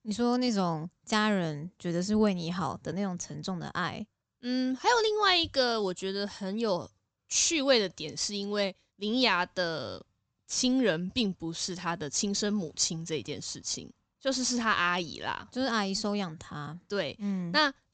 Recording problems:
high frequencies cut off; noticeable; nothing above 8 kHz

